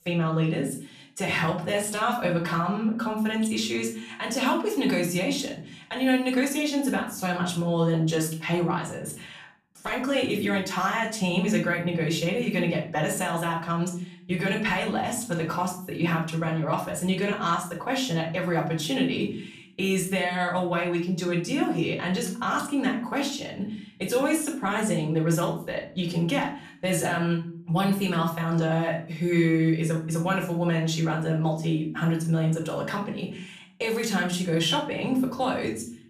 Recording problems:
off-mic speech; far
room echo; slight; dies away in 0.4 s

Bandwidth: 14.5 kHz